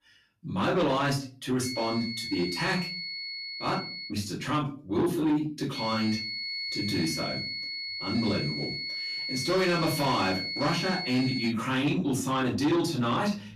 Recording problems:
off-mic speech; far
room echo; slight; dies away in 0.3 s
distortion; slight; 10 dB below the speech
high-pitched whine; loud; from 1.5 to 4 s and from 6 to 12 s; 4.5 kHz, 4 dB below the speech

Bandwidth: 14 kHz